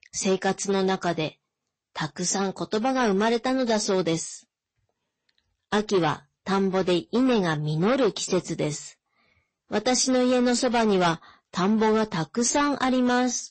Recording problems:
distortion; slight; 8% of the sound clipped
garbled, watery; slightly; nothing above 8 kHz

